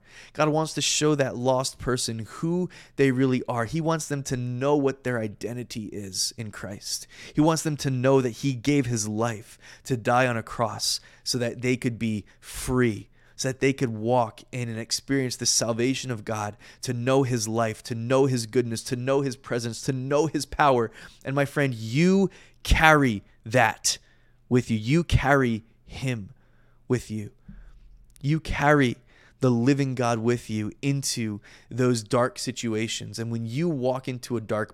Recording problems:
none

